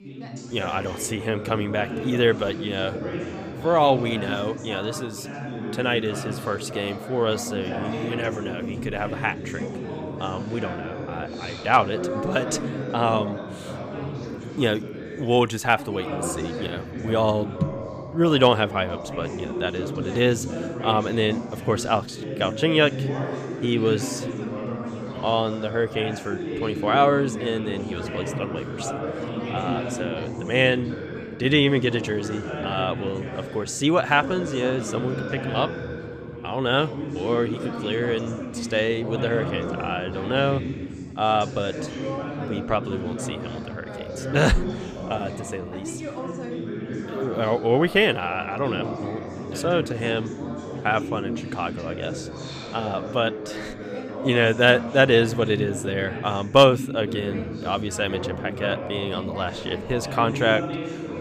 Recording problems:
background chatter; loud; throughout; 4 voices, 7 dB below the speech

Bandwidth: 15 kHz